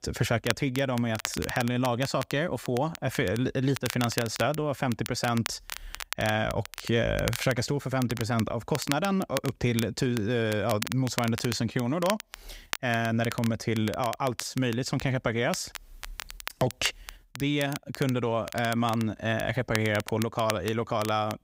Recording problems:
crackle, like an old record; noticeable; 10 dB below the speech

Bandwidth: 15.5 kHz